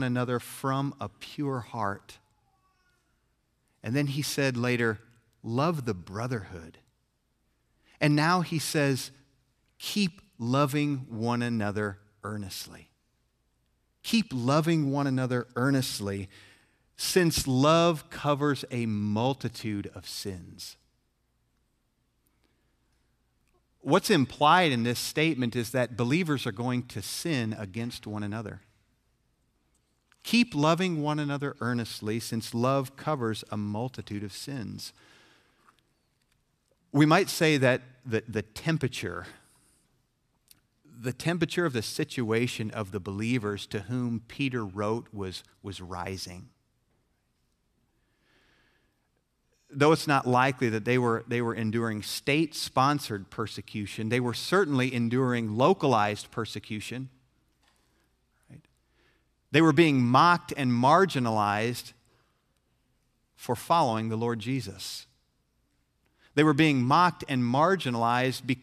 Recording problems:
abrupt cut into speech; at the start

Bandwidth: 14 kHz